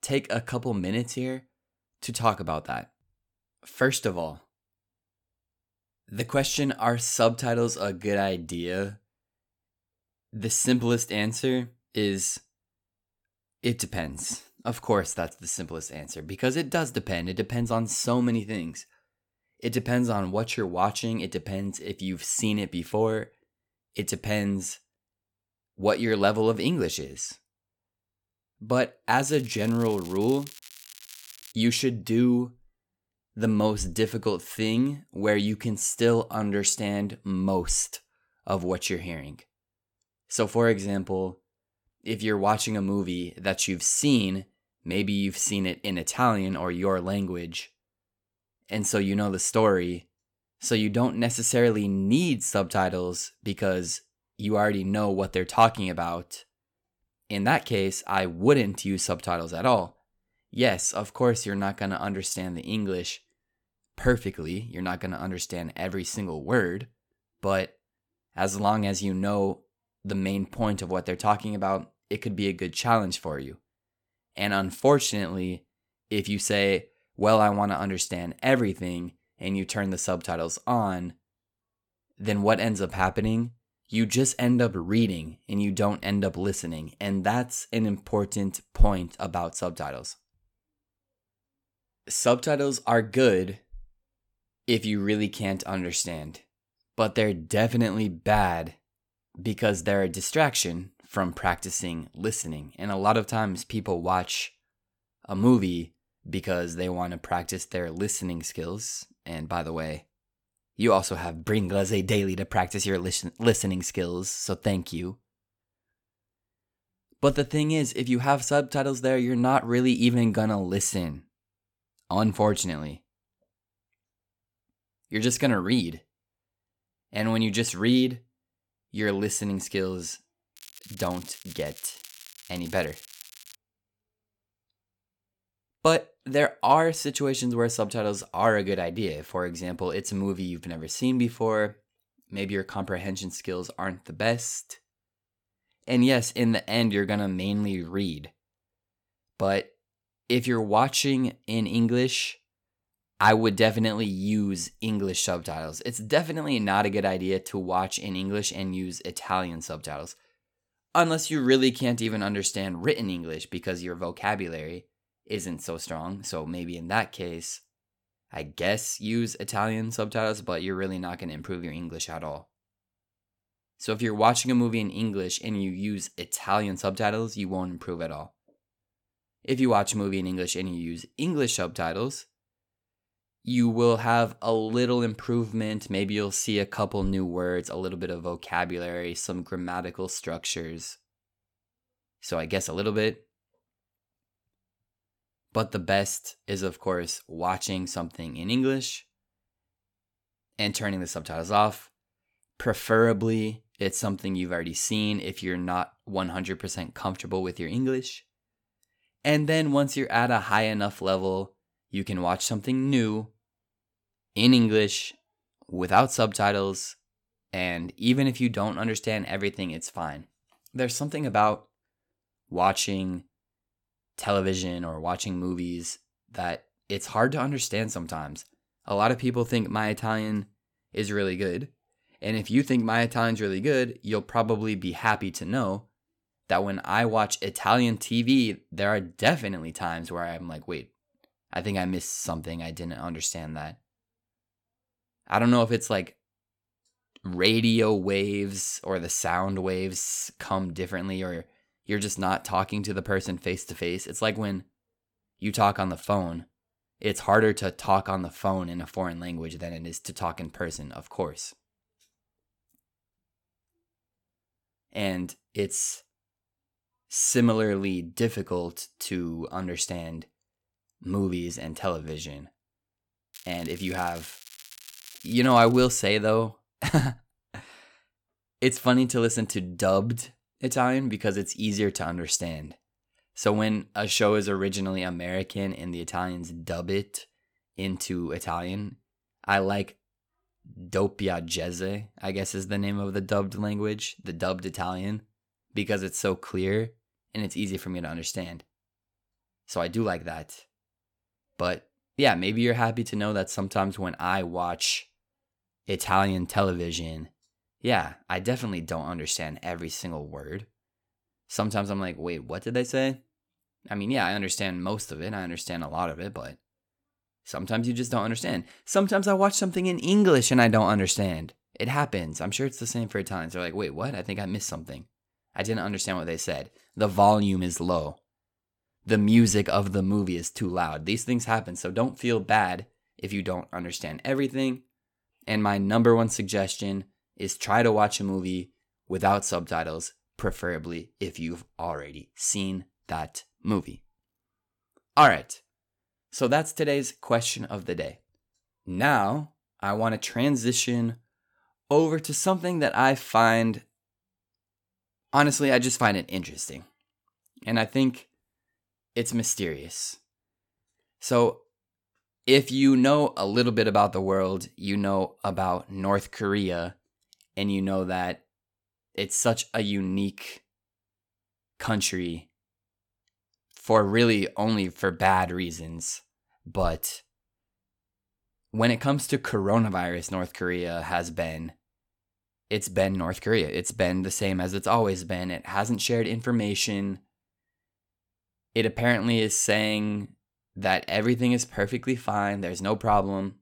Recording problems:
crackling; noticeable; from 29 to 32 s, from 2:11 to 2:14 and from 4:33 to 4:36; 20 dB below the speech

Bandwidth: 17.5 kHz